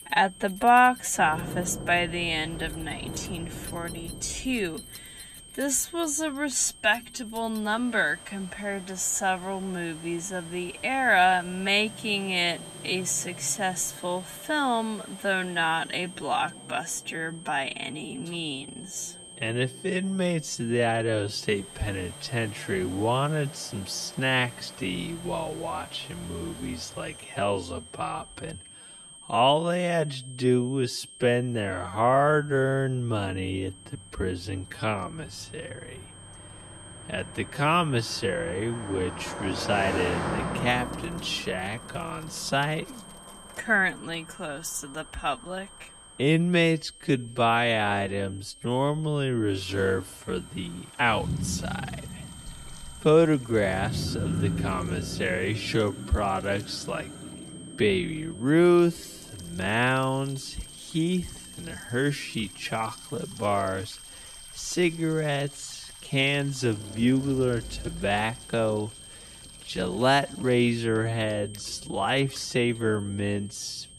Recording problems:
wrong speed, natural pitch; too slow; 0.5 times normal speed
high-pitched whine; noticeable; throughout; 8.5 kHz, 20 dB below the speech
traffic noise; noticeable; throughout; 10 dB below the speech
household noises; faint; throughout; 25 dB below the speech

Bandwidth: 14 kHz